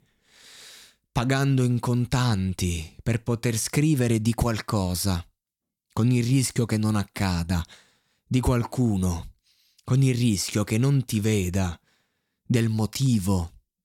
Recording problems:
none

